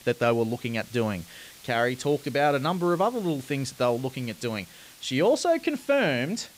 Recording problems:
hiss; faint; throughout; 20 dB below the speech

